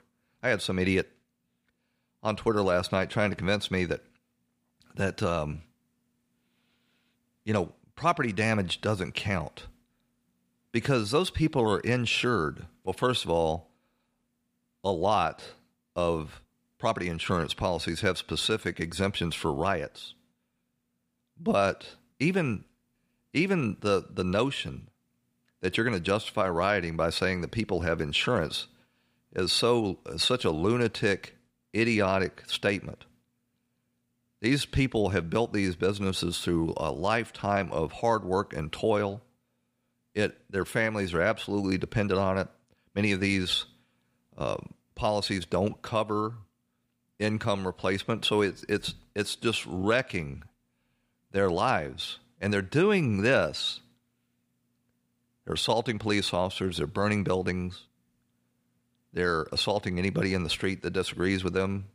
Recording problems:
none

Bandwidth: 15 kHz